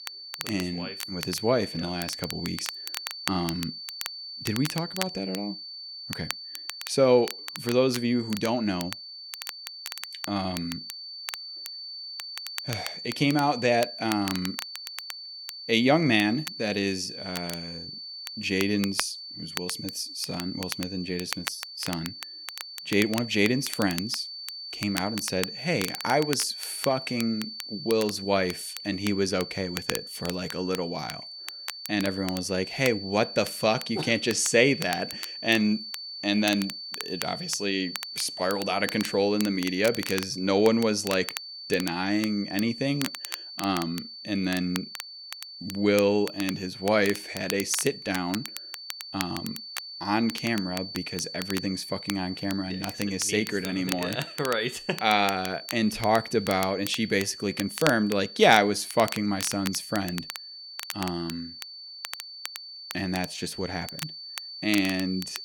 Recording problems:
high-pitched whine; noticeable; throughout; 4.5 kHz, 10 dB below the speech
crackle, like an old record; noticeable; 10 dB below the speech

